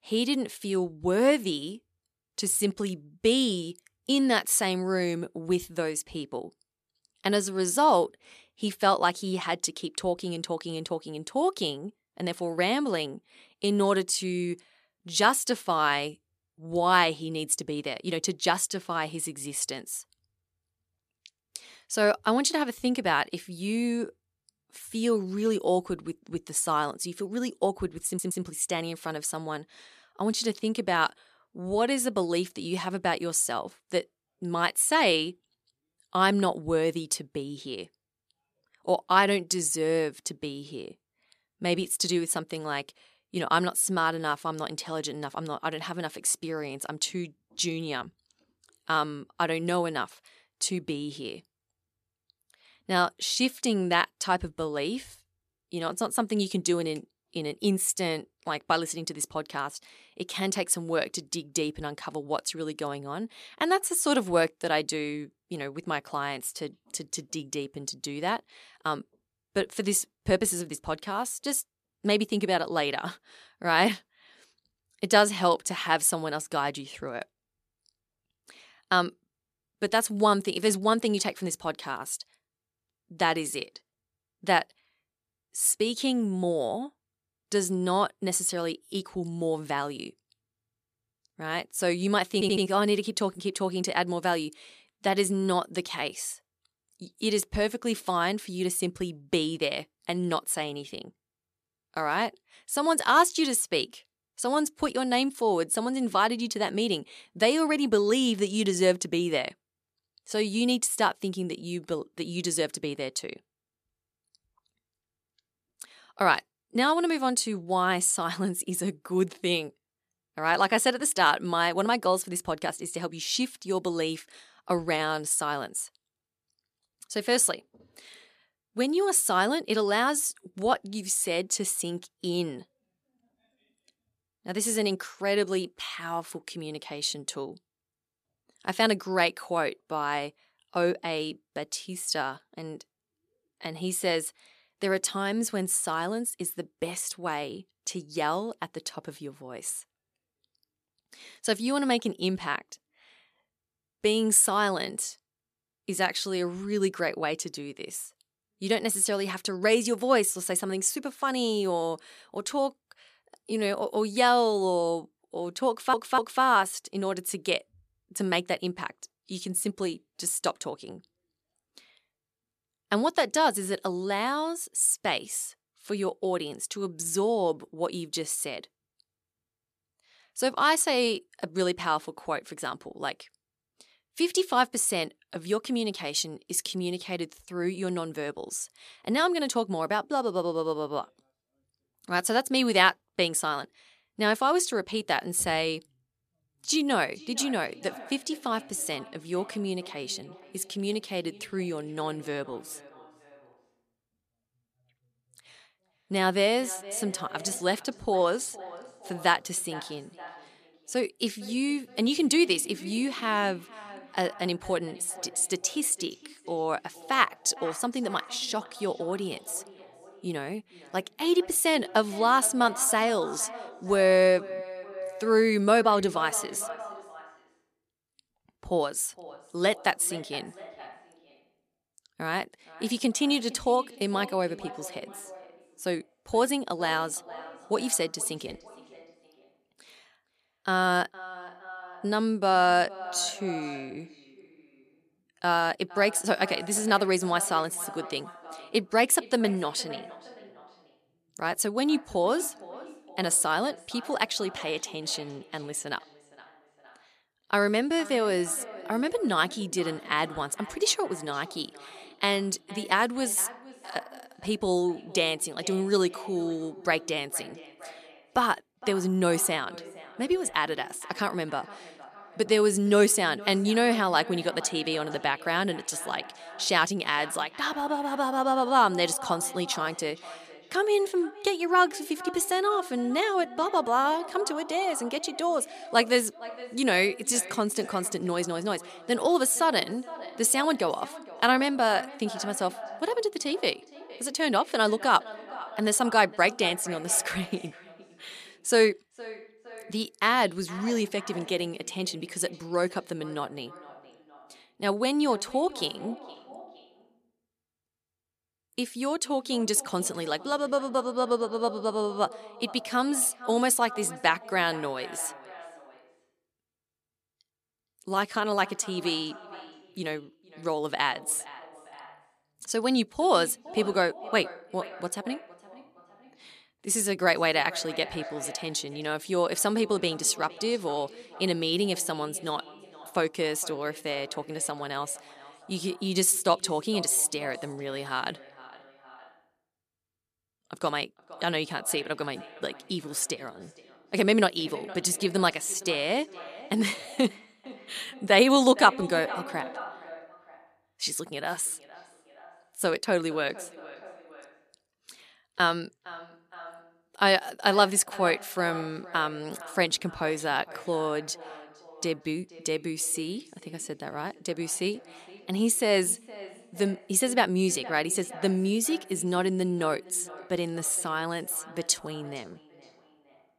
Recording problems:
echo of what is said; noticeable; from 3:17 on; 460 ms later, 15 dB below the speech
audio stuttering; at 28 s, at 1:32 and at 2:46

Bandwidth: 14.5 kHz